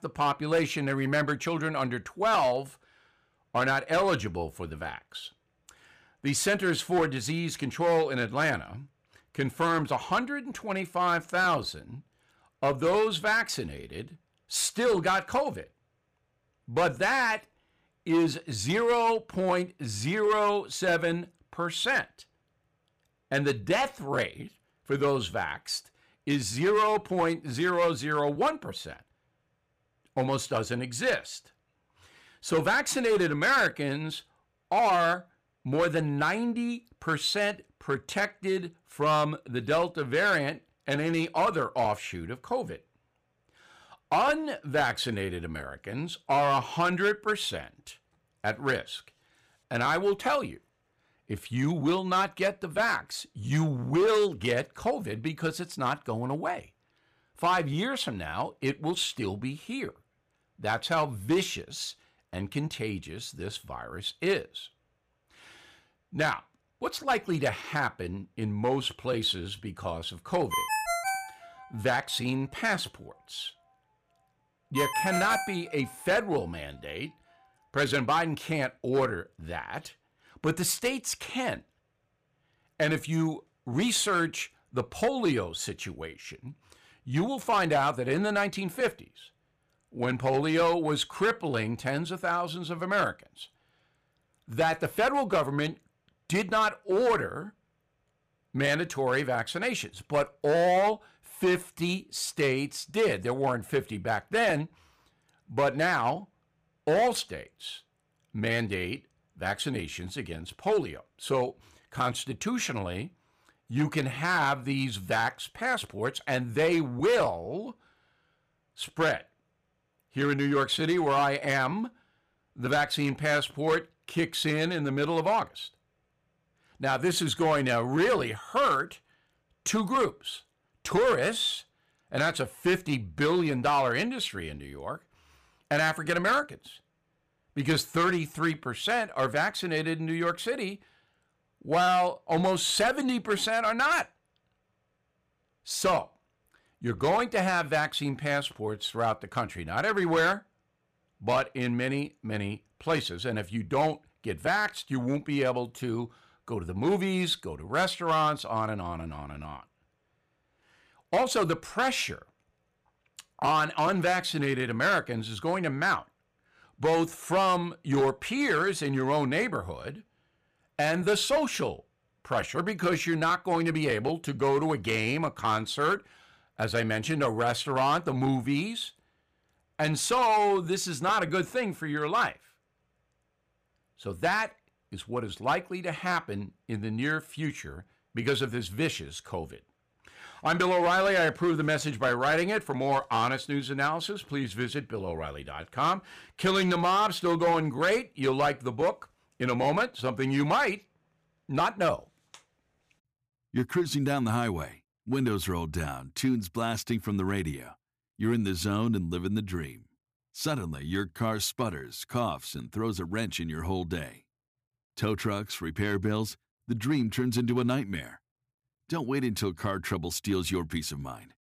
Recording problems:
distortion; slight; 4% of the sound clipped
phone ringing; loud; from 1:11 to 1:16; peak level with the speech

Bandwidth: 15 kHz